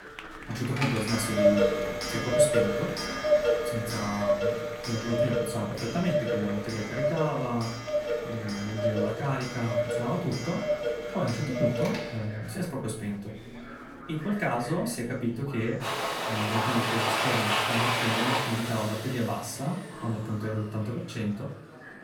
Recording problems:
off-mic speech; far
room echo; slight; dies away in 0.4 s
household noises; very loud; throughout; 2 dB above the speech
chatter from many people; noticeable; throughout; 15 dB below the speech

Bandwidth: 17.5 kHz